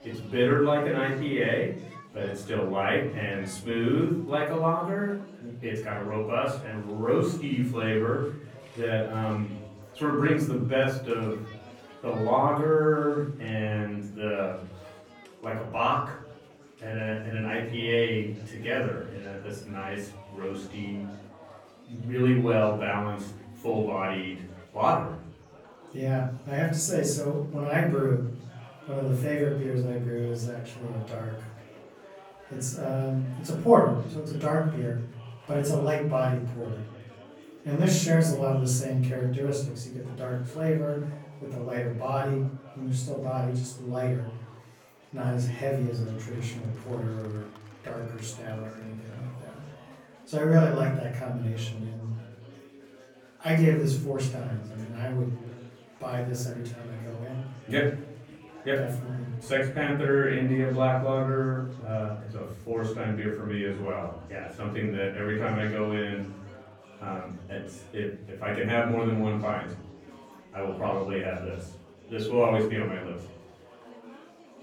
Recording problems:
off-mic speech; far
room echo; noticeable; dies away in 0.8 s
chatter from many people; faint; throughout; 20 dB below the speech

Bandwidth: 18.5 kHz